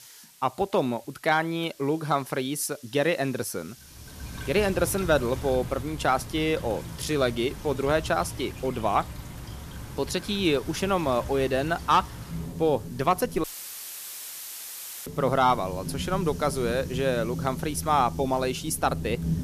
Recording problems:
rain or running water; noticeable; from 4 s on; 10 dB below the speech
hiss; faint; throughout; 25 dB below the speech
audio cutting out; filled with static; at 13 s for 1.5 s

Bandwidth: 14.5 kHz